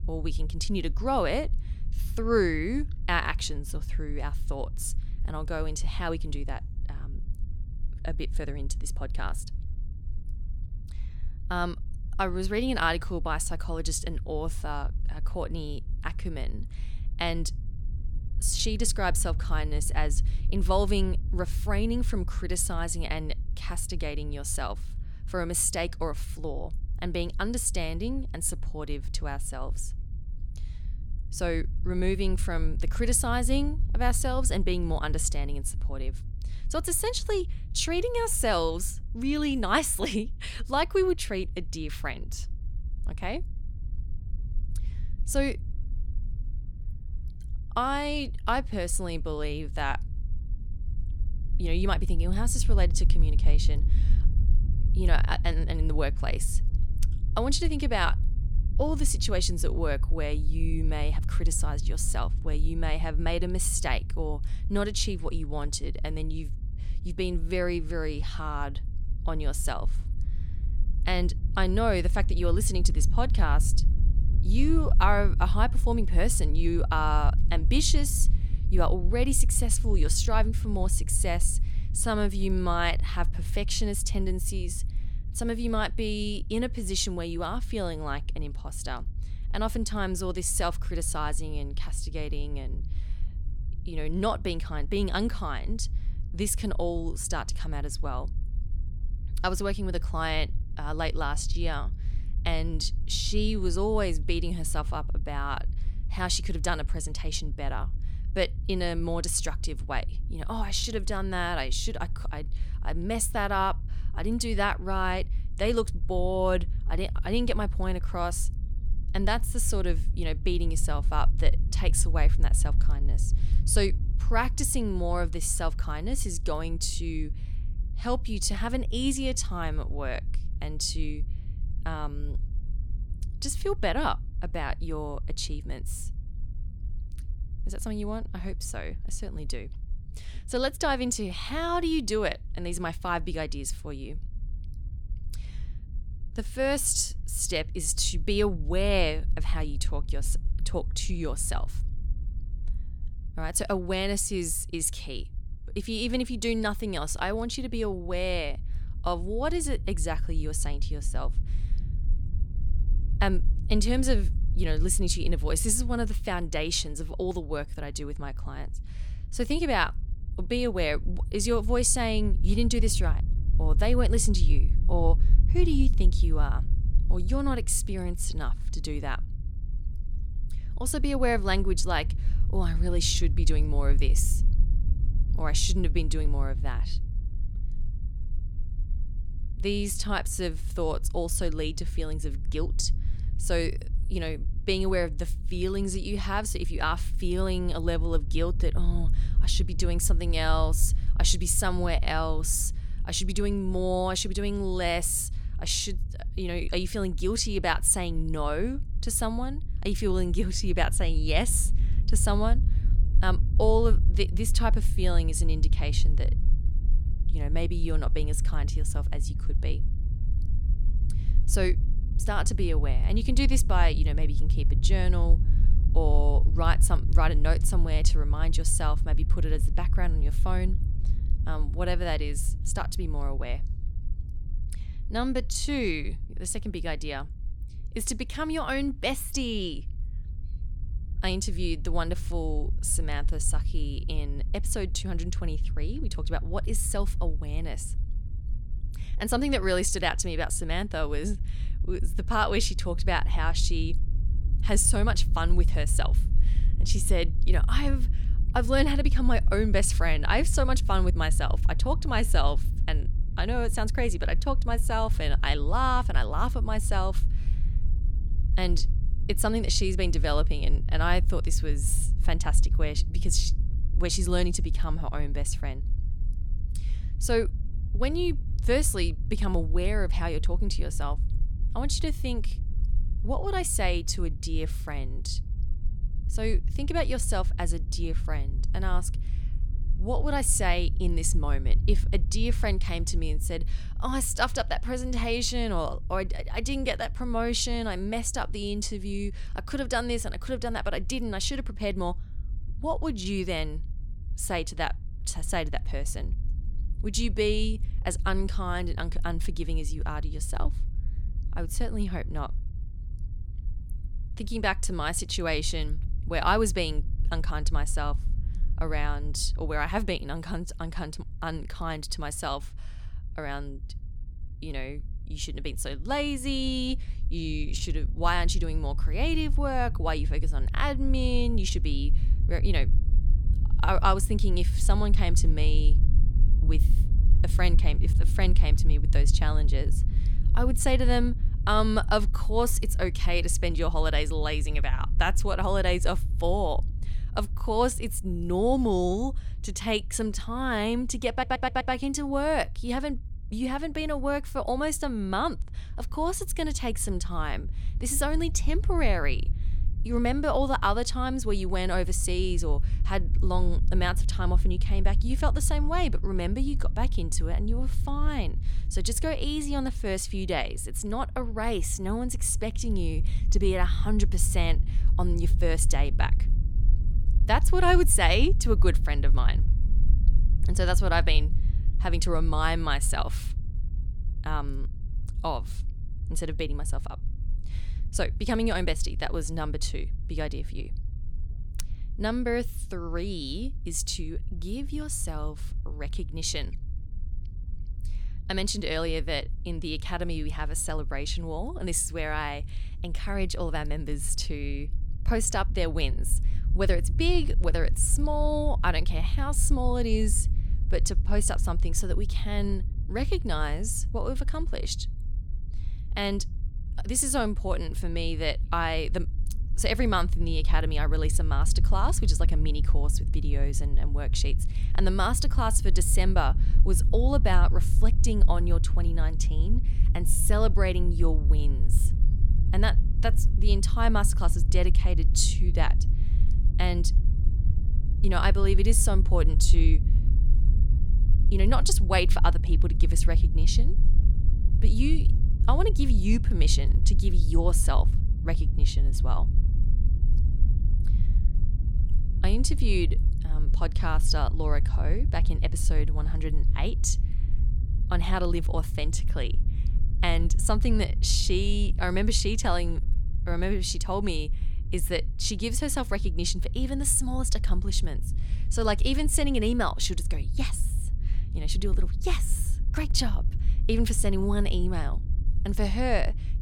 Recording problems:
low rumble; noticeable; throughout; 20 dB below the speech
audio stuttering; at 5:51

